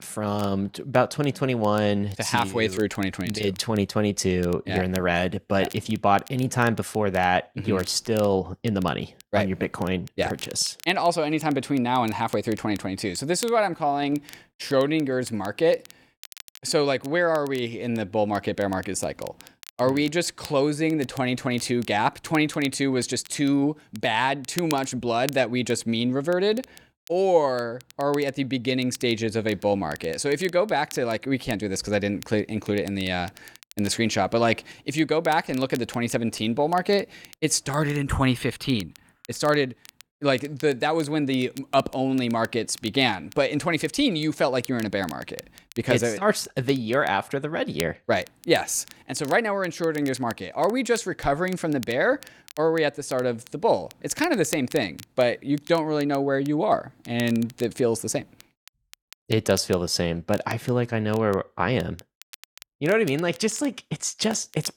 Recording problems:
crackle, like an old record; faint; 20 dB below the speech

